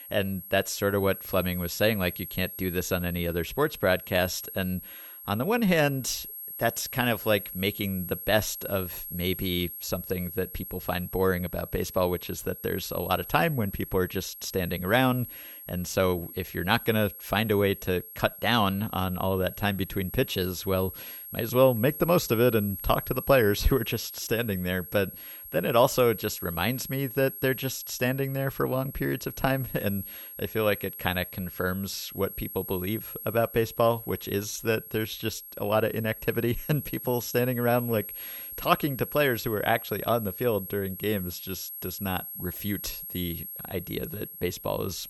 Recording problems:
high-pitched whine; loud; throughout; 11.5 kHz, 10 dB below the speech

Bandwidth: 19 kHz